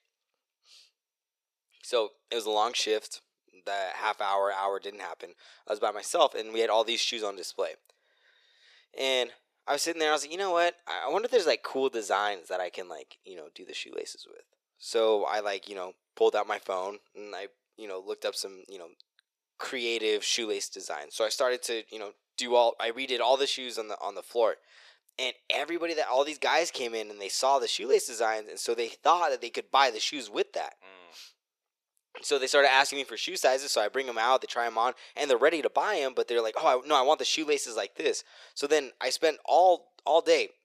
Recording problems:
thin; very; fading below 450 Hz

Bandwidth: 14.5 kHz